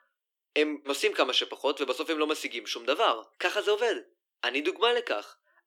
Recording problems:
thin; somewhat; fading below 300 Hz

